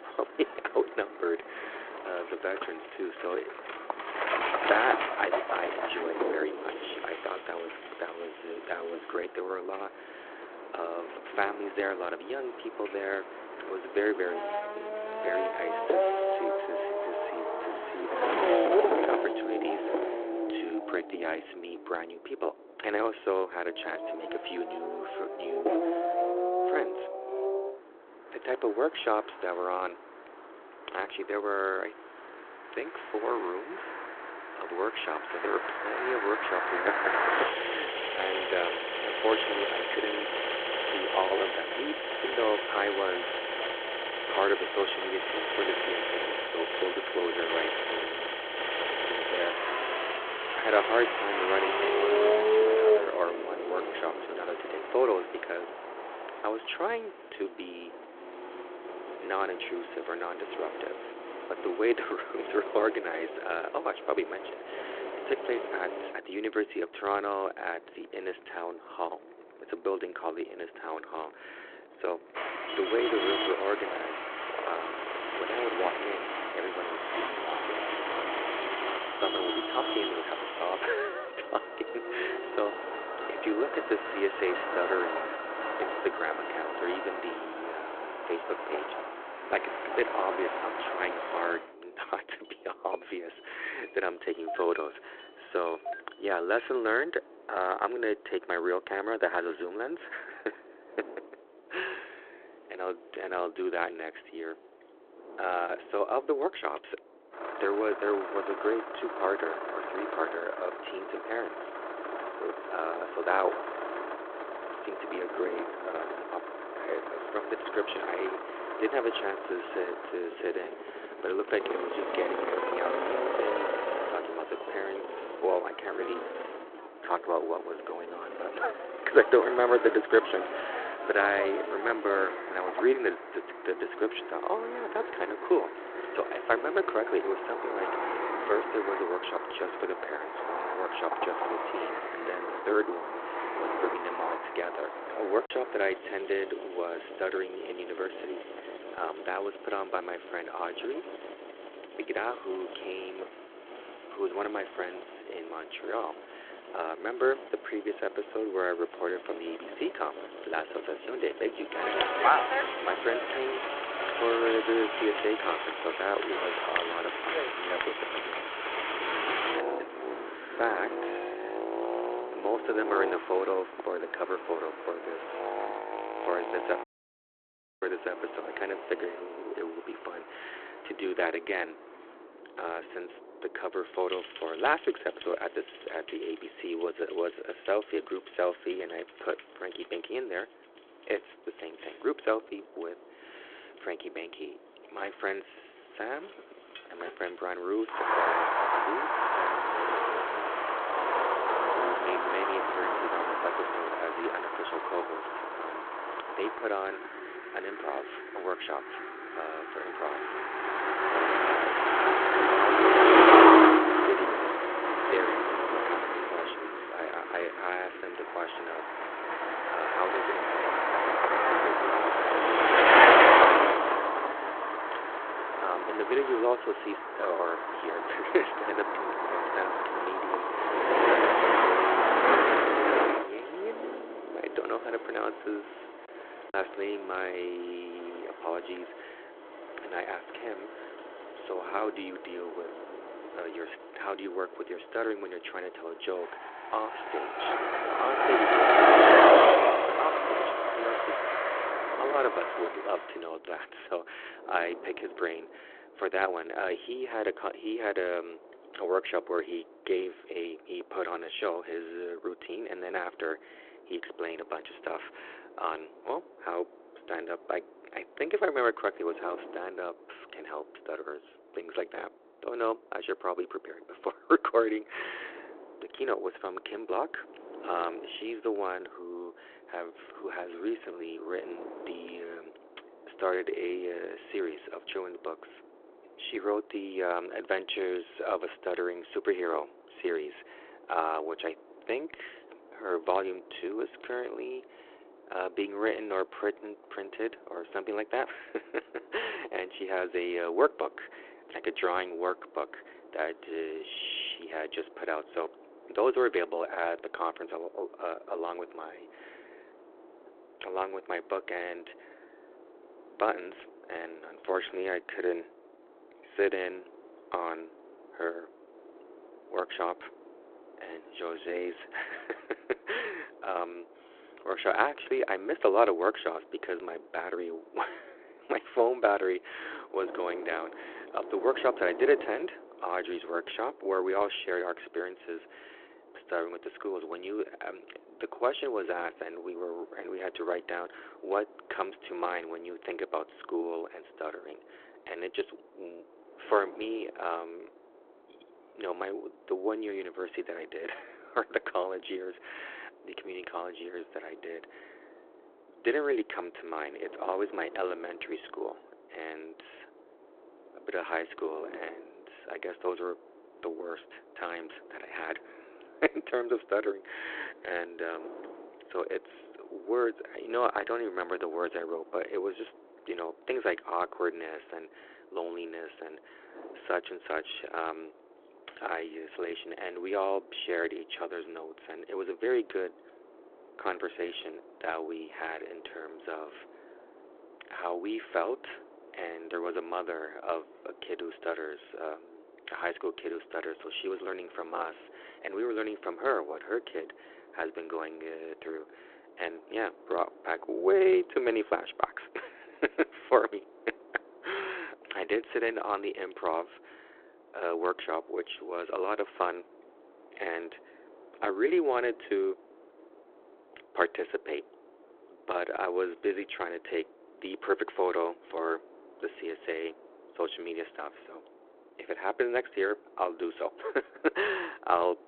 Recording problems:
phone-call audio
traffic noise; very loud; until 4:13; 5 dB above the speech
wind noise on the microphone; occasional gusts; 20 dB below the speech
choppy; occasionally; at 2:25 and at 3:57; 1% of the speech affected
audio cutting out; at 2:57 for 1 s

